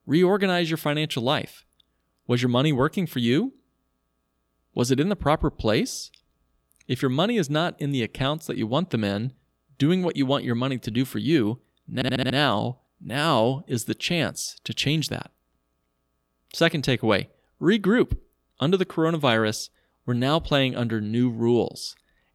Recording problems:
audio stuttering; at 12 s

